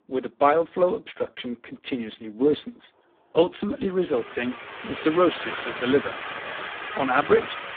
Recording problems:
phone-call audio; poor line
traffic noise; loud; throughout; 8 dB below the speech

